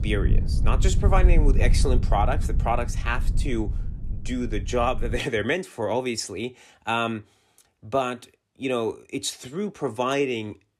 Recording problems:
low rumble; noticeable; until 5 s; 15 dB below the speech

